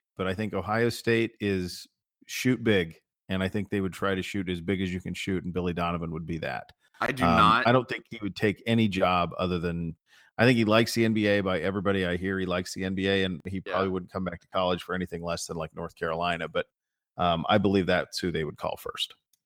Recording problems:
none

